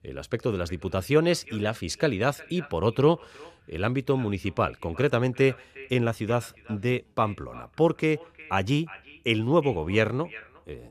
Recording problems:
echo of what is said; faint; throughout; 360 ms later, 20 dB below the speech

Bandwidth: 14 kHz